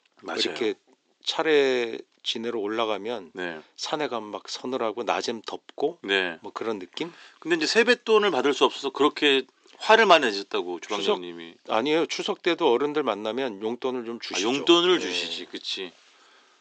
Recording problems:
thin; somewhat; fading below 350 Hz
high frequencies cut off; noticeable; nothing above 8 kHz

